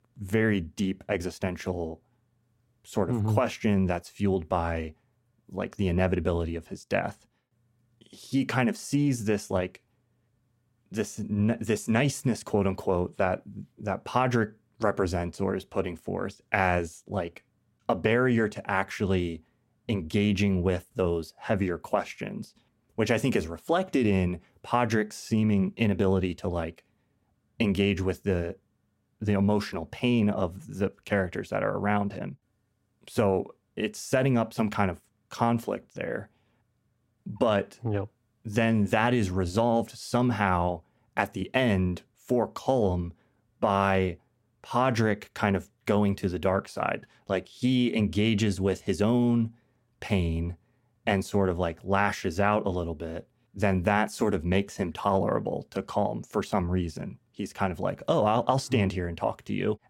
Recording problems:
none

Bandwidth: 16 kHz